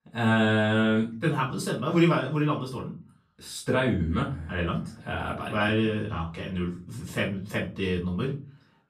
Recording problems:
off-mic speech; far
room echo; slight; dies away in 0.3 s

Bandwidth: 14.5 kHz